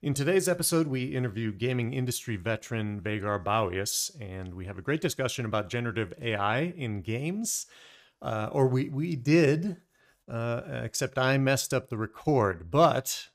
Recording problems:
none

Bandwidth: 15 kHz